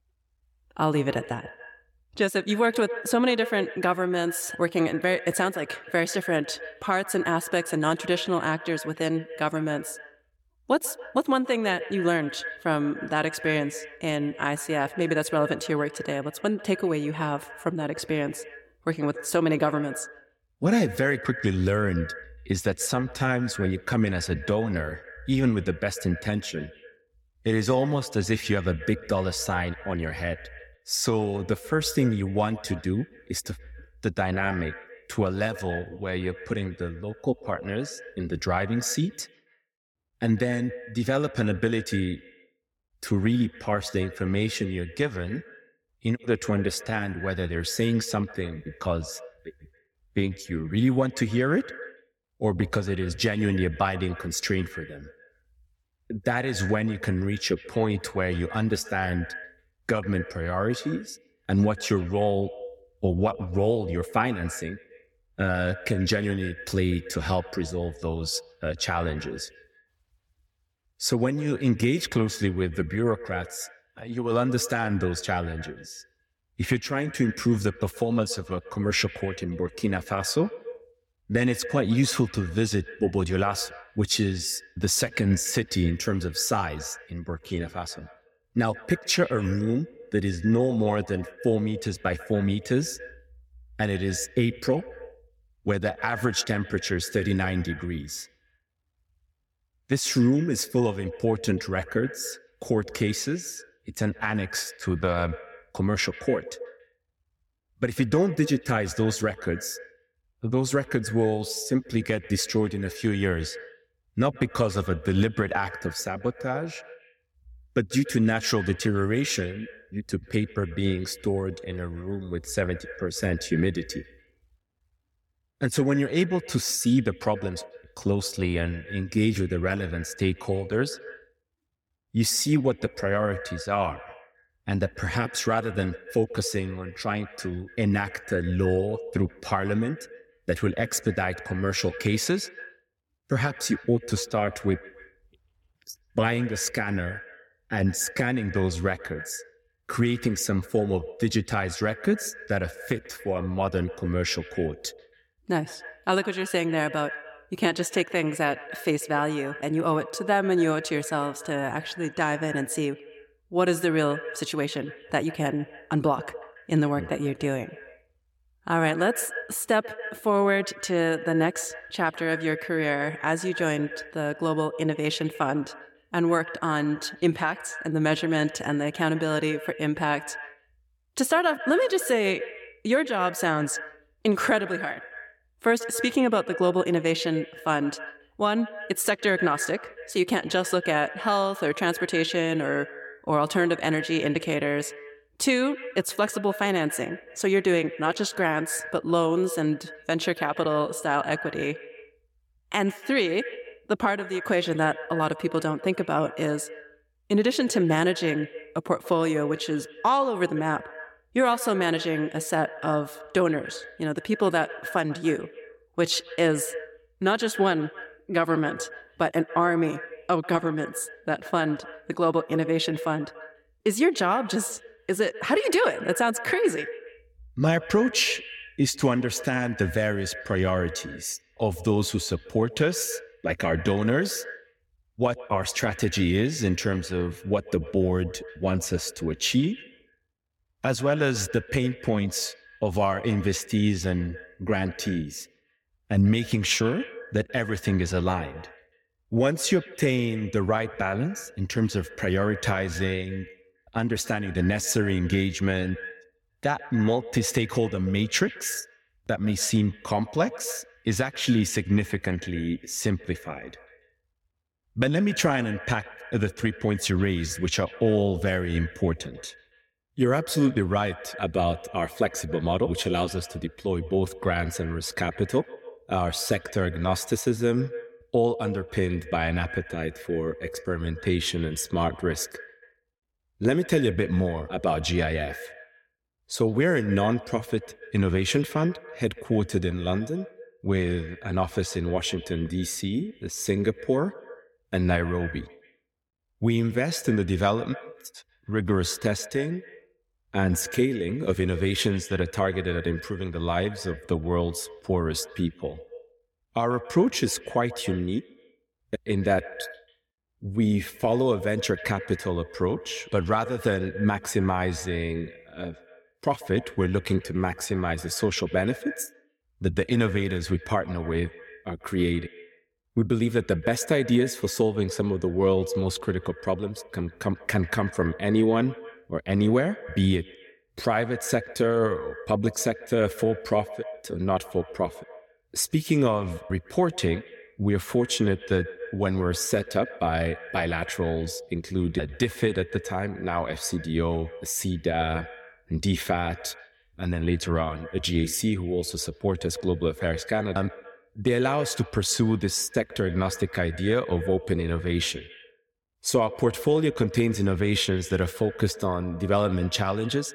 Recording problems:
echo of what is said; noticeable; throughout; 140 ms later, 15 dB below the speech

